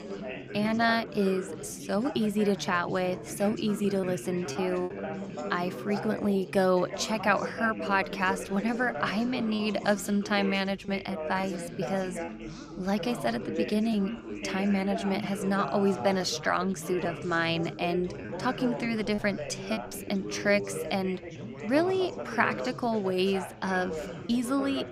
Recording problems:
background chatter; loud; throughout; 4 voices, 9 dB below the speech
choppy; occasionally; 3% of the speech affected

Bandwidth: 15.5 kHz